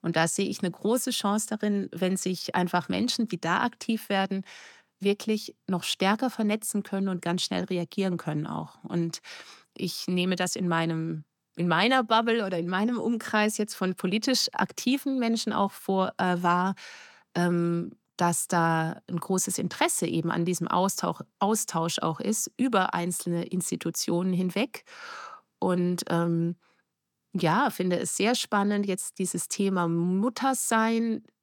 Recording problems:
none

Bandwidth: 18 kHz